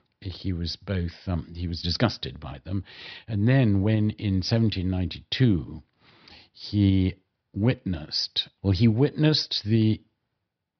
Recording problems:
high frequencies cut off; noticeable; nothing above 5.5 kHz

